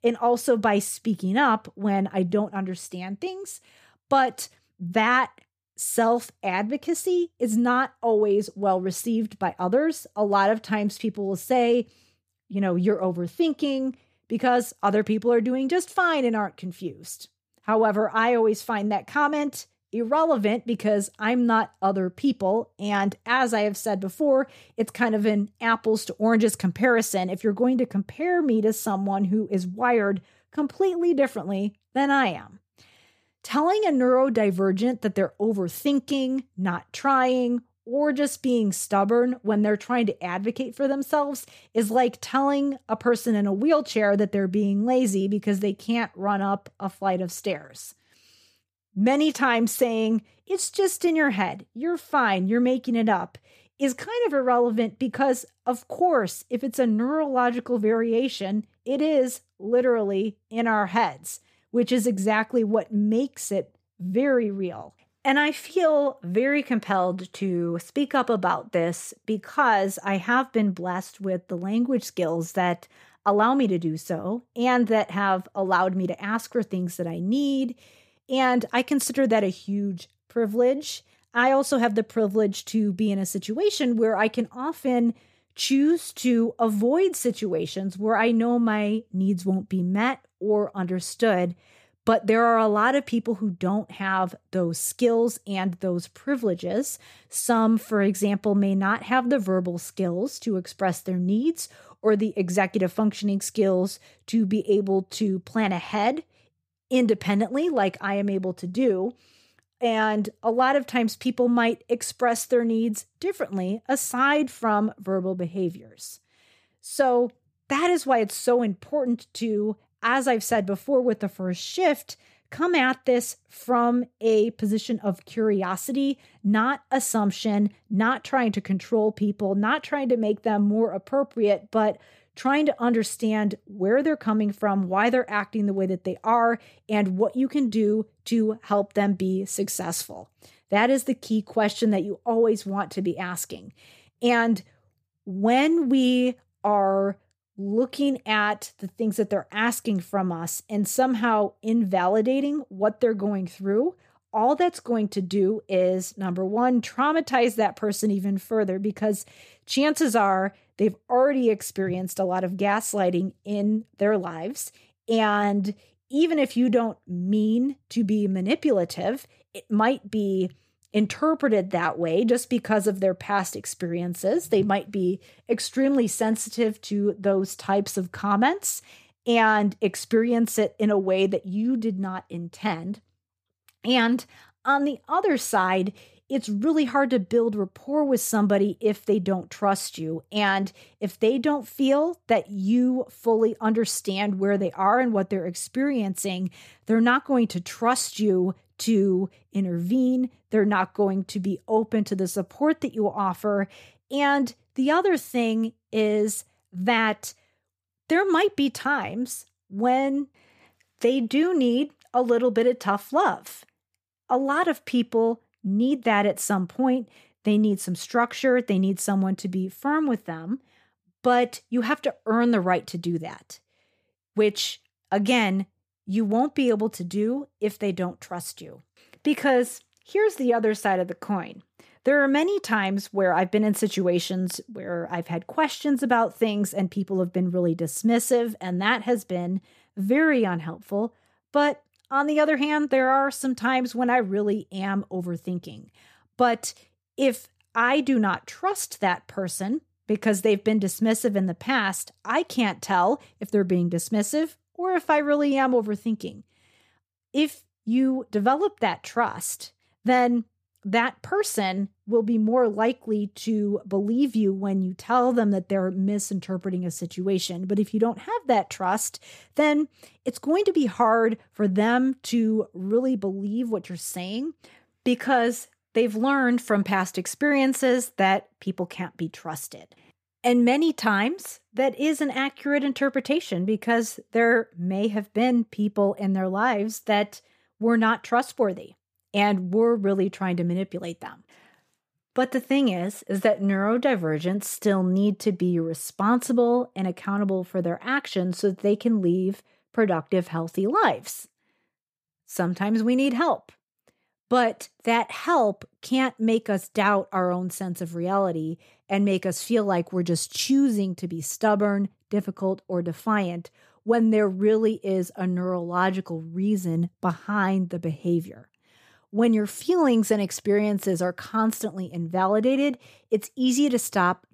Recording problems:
none

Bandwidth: 15 kHz